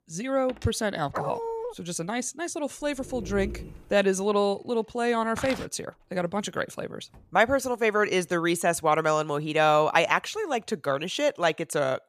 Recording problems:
household noises; faint; until 8.5 s; 30 dB below the speech
dog barking; noticeable; at 1 s; peak 5 dB below the speech
dog barking; faint; from 3 to 4 s; peak 10 dB below the speech
footsteps; faint; at 5.5 s; peak 10 dB below the speech

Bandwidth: 14.5 kHz